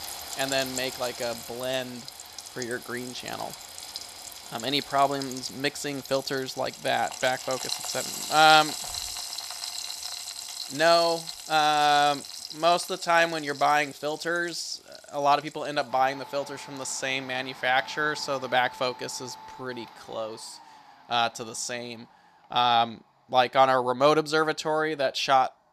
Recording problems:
thin; somewhat; fading below 450 Hz
household noises; noticeable; throughout; 10 dB below the speech

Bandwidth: 14.5 kHz